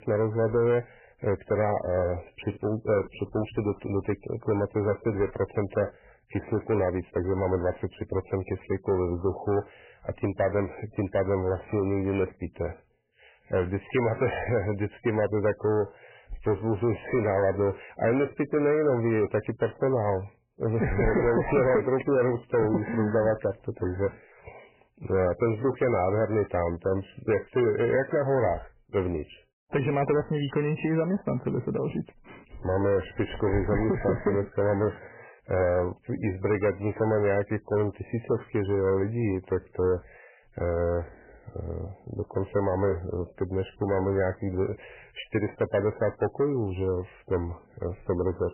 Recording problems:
garbled, watery; badly; nothing above 3 kHz
distortion; slight; 10 dB below the speech

